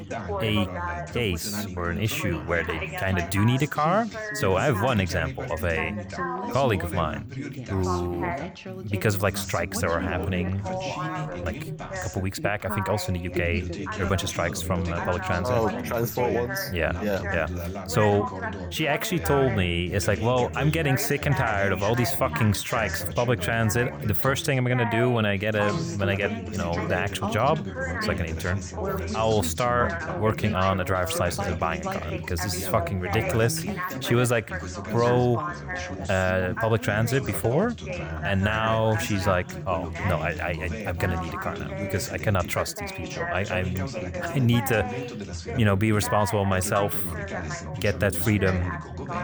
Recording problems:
background chatter; loud; throughout; 3 voices, 6 dB below the speech

